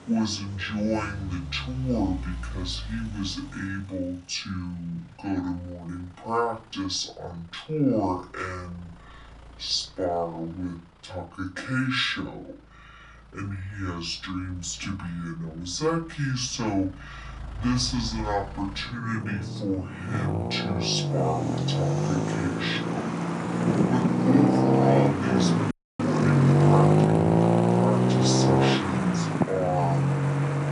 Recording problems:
off-mic speech; far
wrong speed and pitch; too slow and too low; 0.6 times normal speed
room echo; very slight; dies away in 0.2 s
traffic noise; very loud; throughout; 5 dB above the speech
audio cutting out; at 26 s

